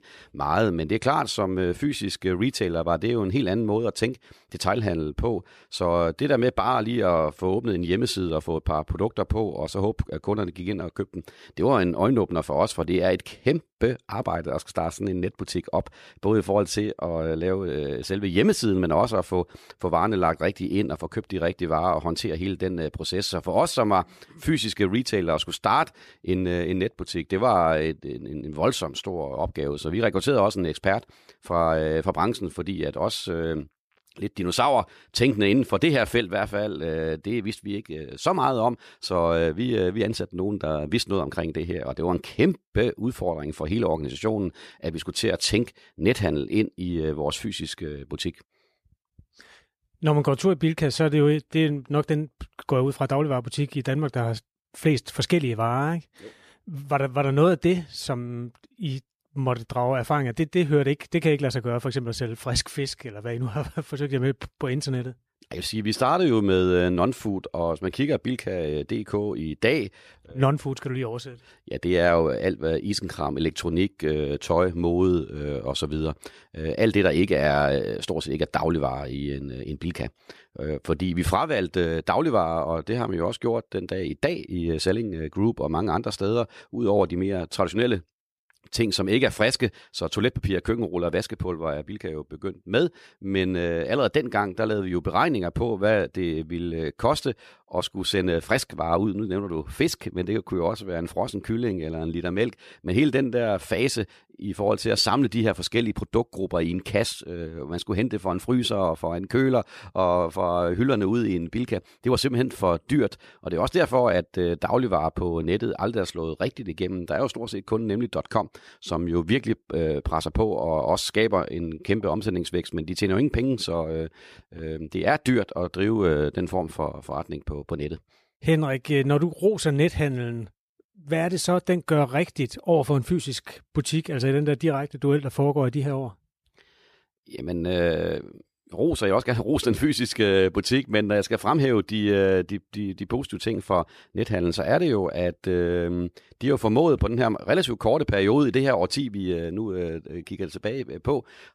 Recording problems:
none

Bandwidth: 14.5 kHz